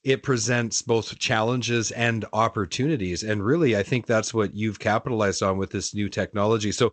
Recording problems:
garbled, watery; slightly; nothing above 7.5 kHz

